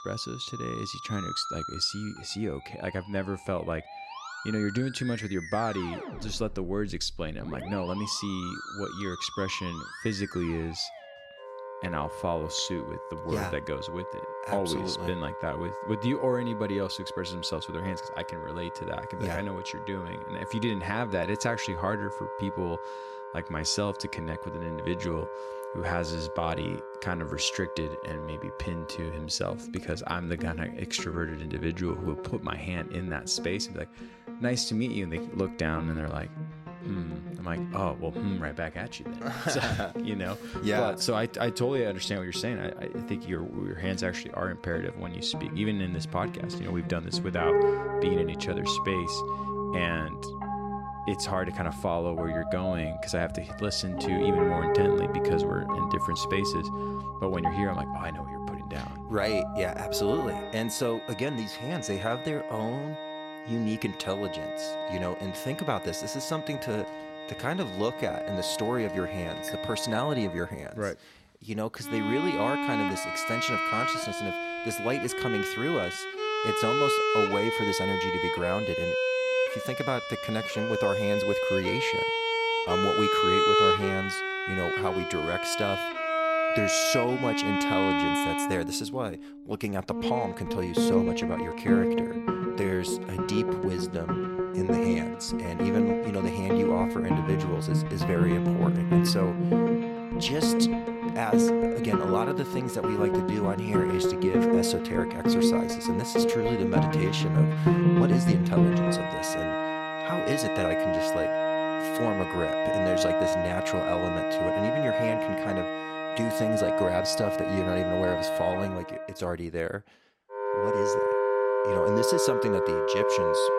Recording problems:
background music; very loud; throughout; 3 dB above the speech

